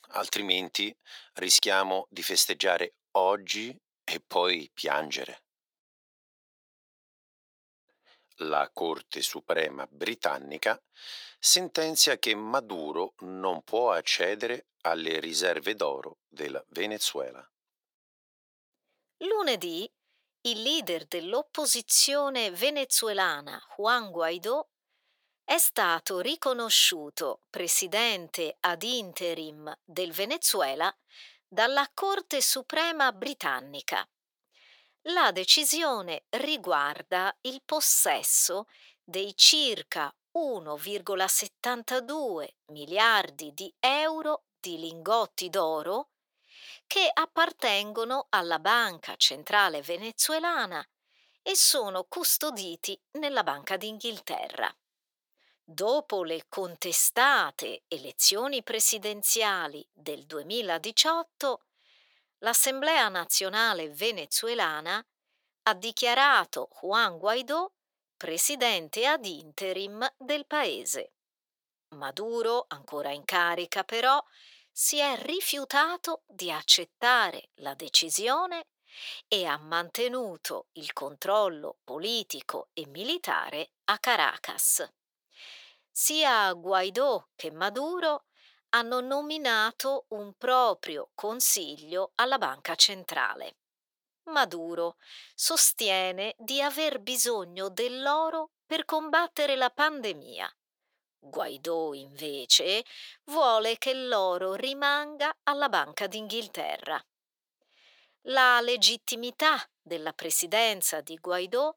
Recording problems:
thin; very; fading below 700 Hz

